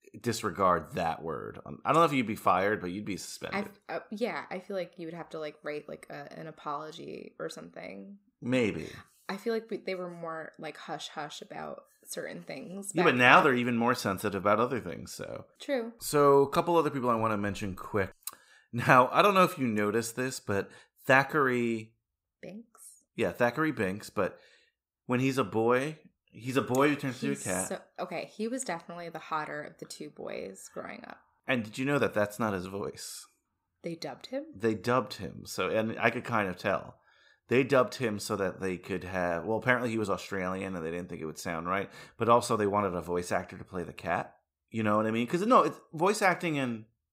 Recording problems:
none

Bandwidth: 15.5 kHz